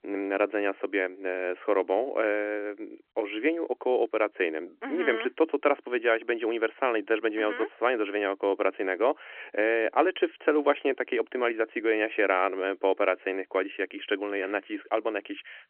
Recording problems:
phone-call audio

